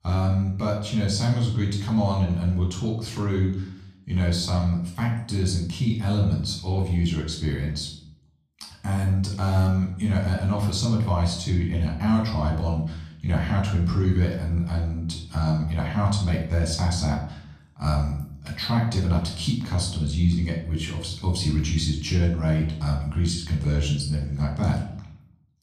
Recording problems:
off-mic speech; far
room echo; noticeable; dies away in 0.6 s

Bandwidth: 14.5 kHz